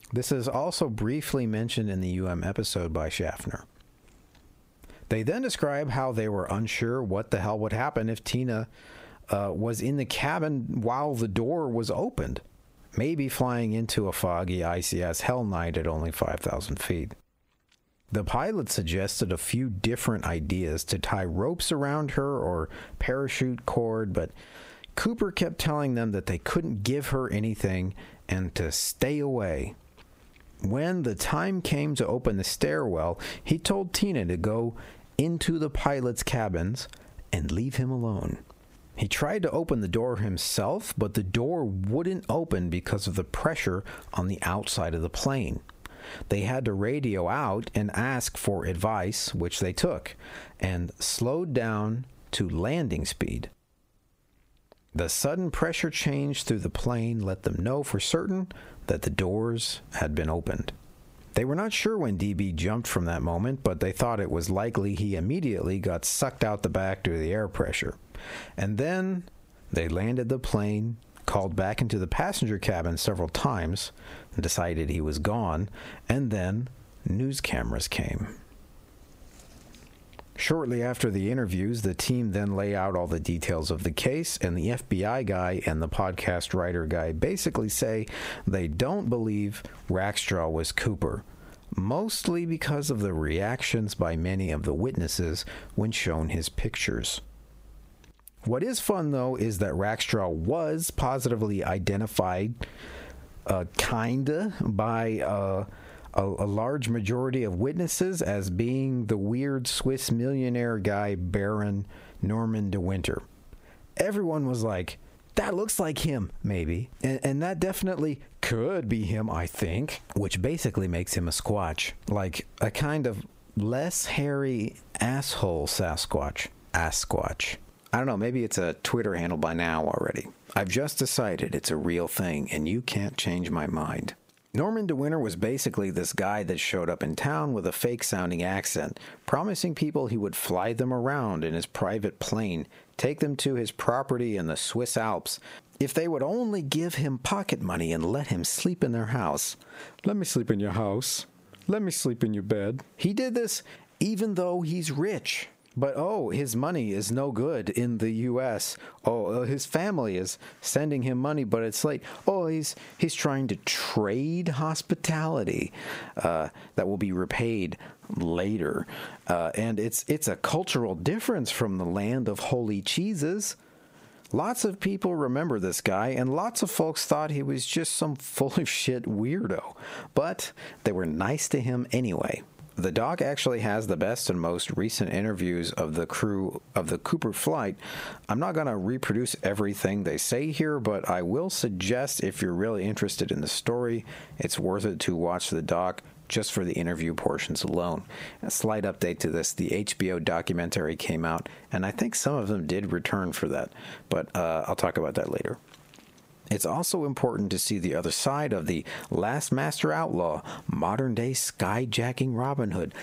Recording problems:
squashed, flat; heavily

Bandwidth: 15.5 kHz